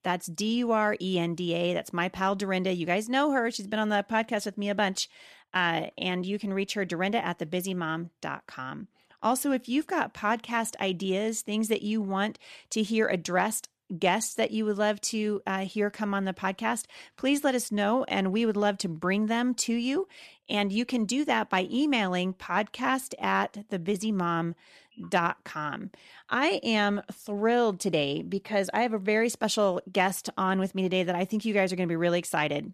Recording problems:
none

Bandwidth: 14 kHz